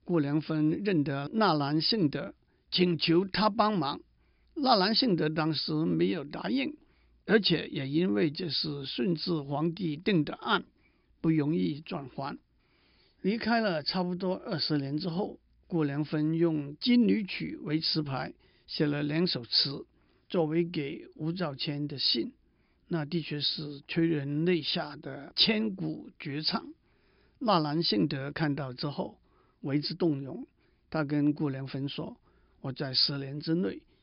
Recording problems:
high frequencies cut off; noticeable; nothing above 5.5 kHz

